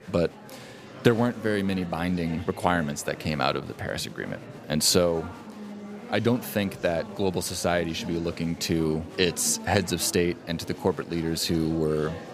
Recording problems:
murmuring crowd; noticeable; throughout; 15 dB below the speech

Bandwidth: 15 kHz